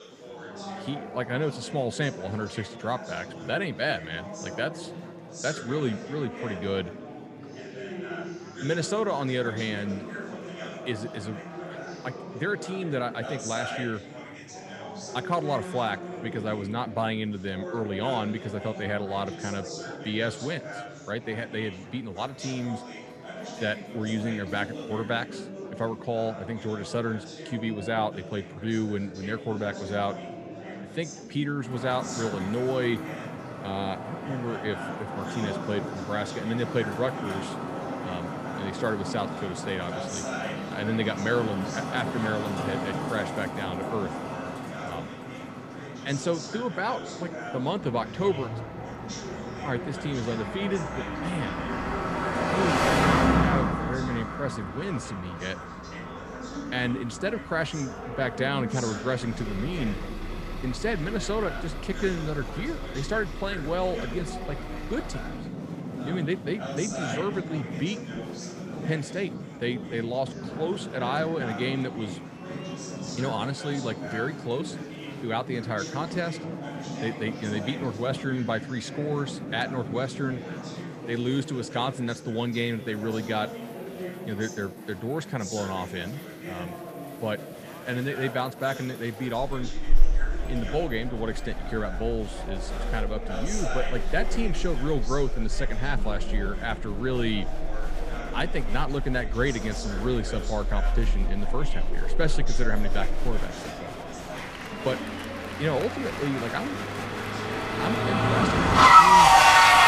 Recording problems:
traffic noise; very loud; from 32 s on; 3 dB above the speech
murmuring crowd; loud; throughout; 7 dB below the speech

